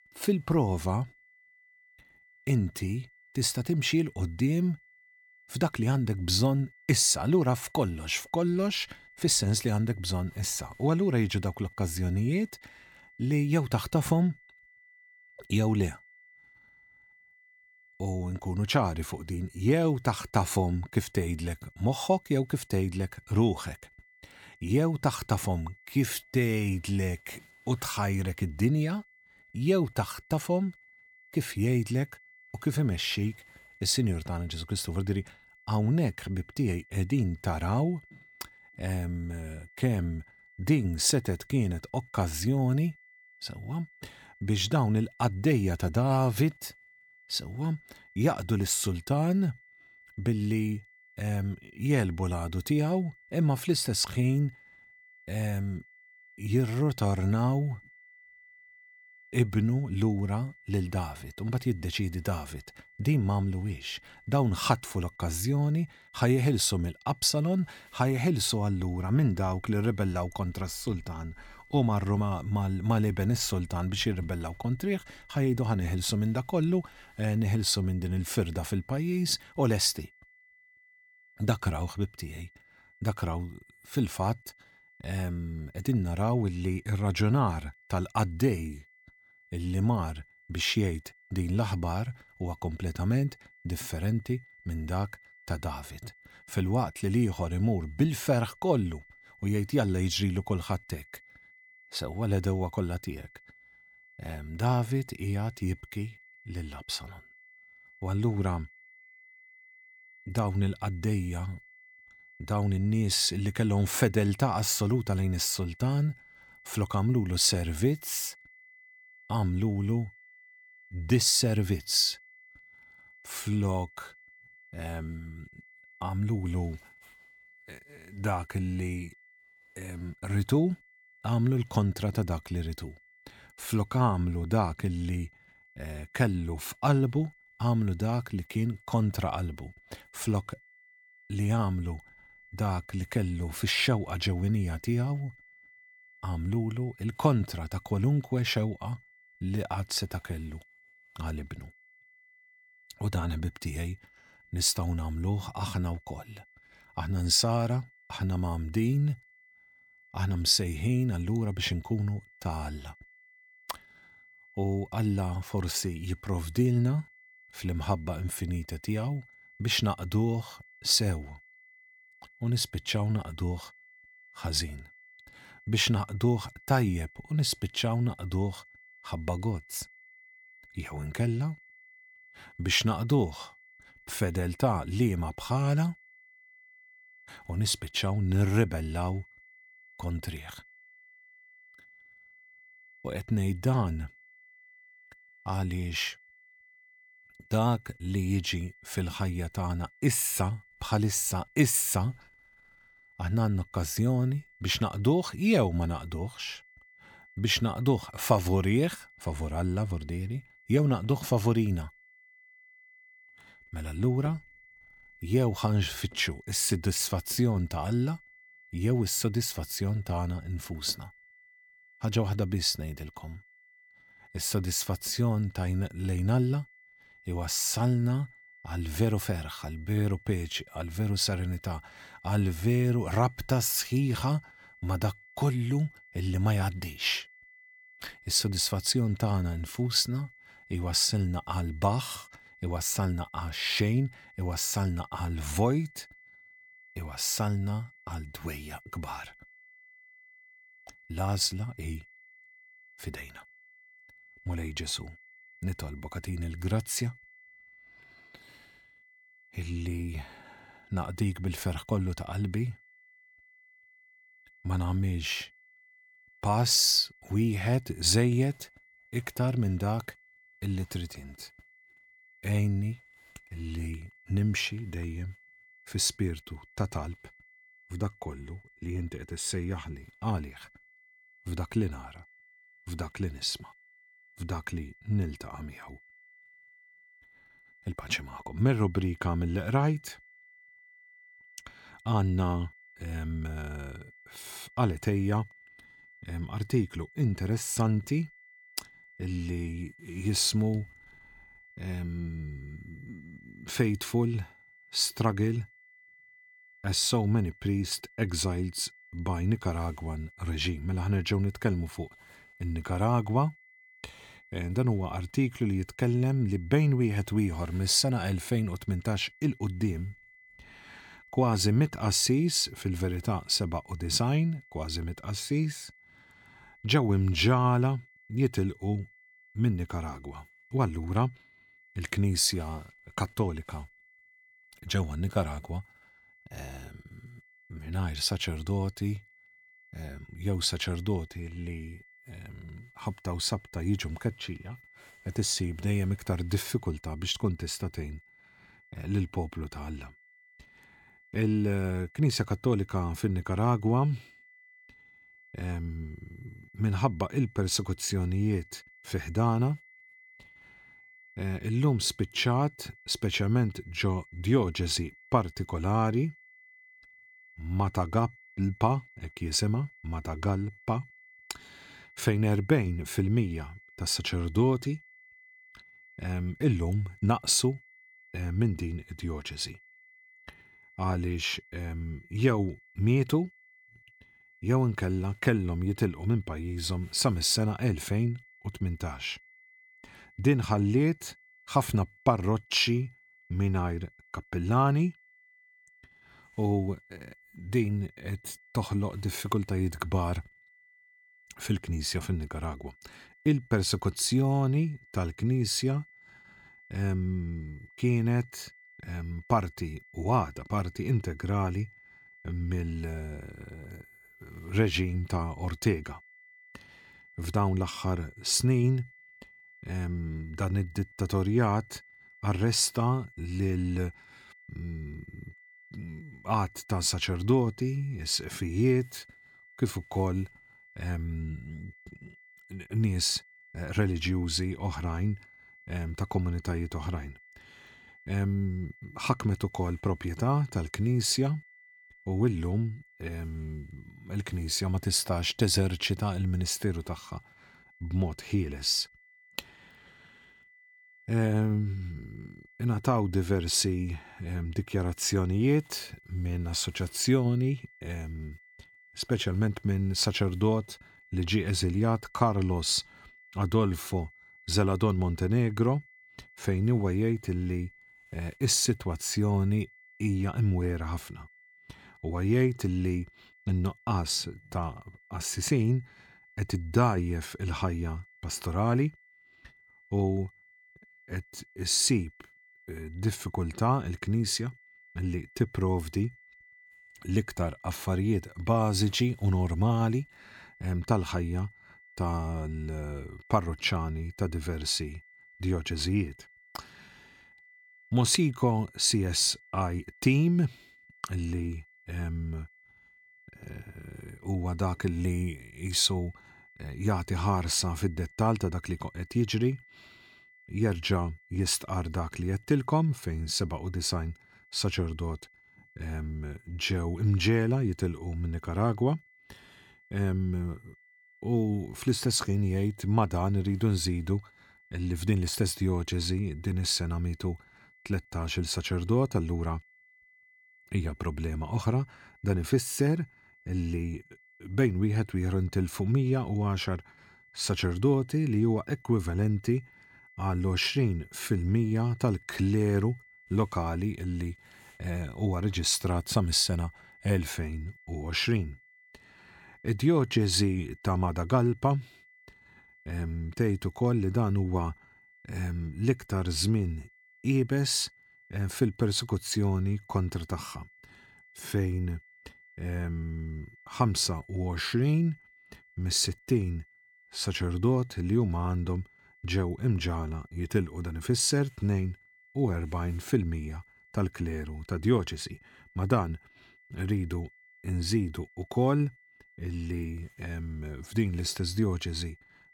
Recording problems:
high-pitched whine; faint; throughout; 2 kHz, 25 dB below the speech

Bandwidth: 18 kHz